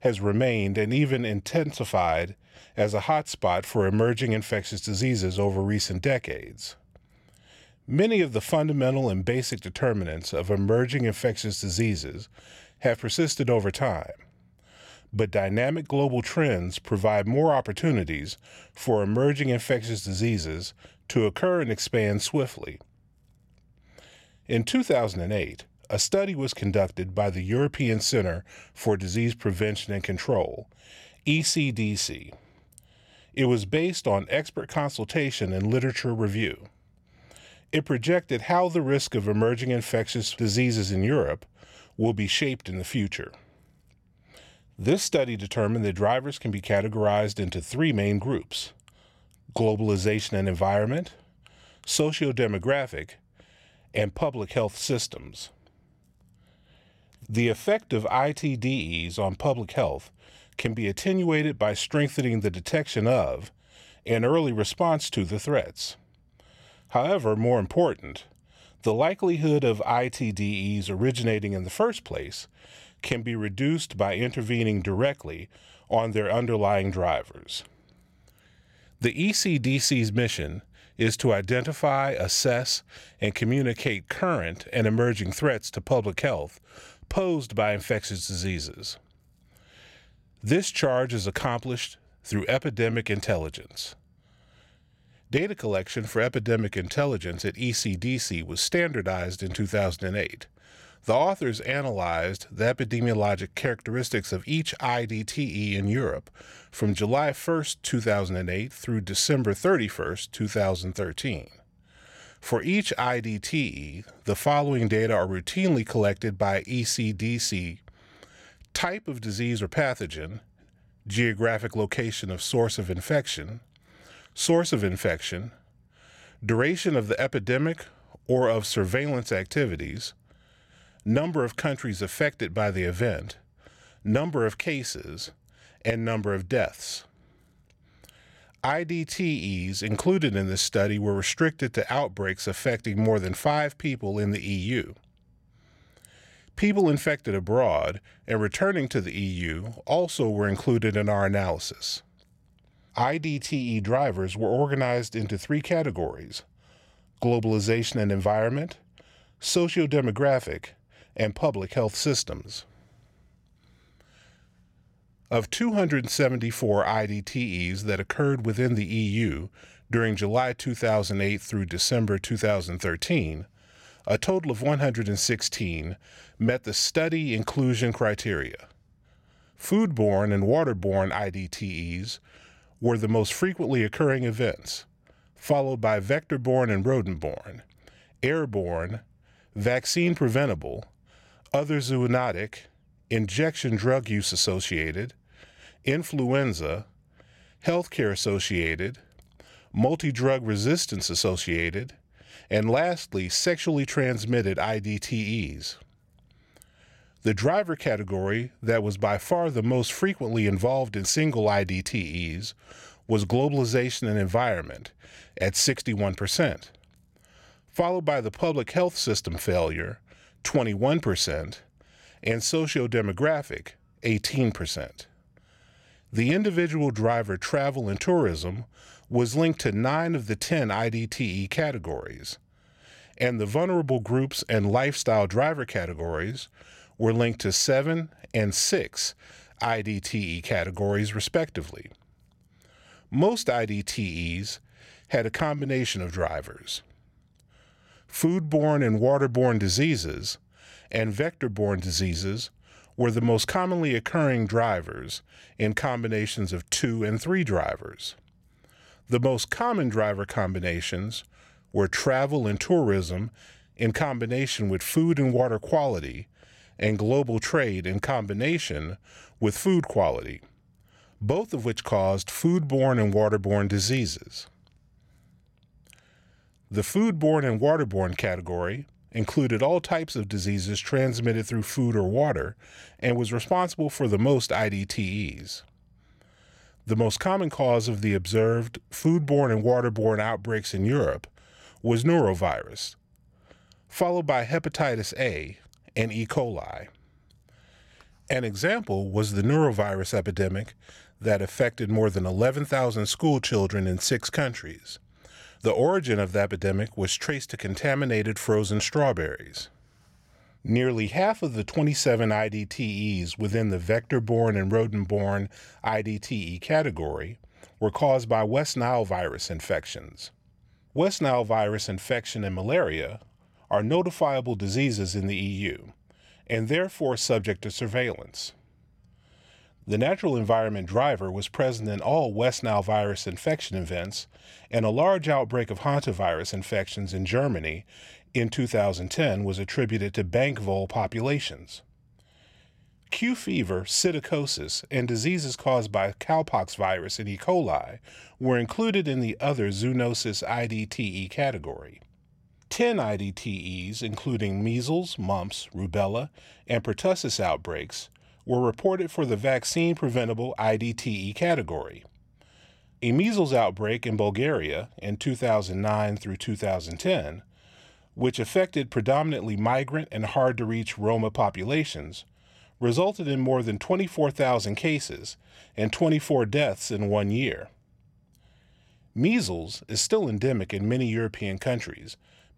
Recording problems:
none

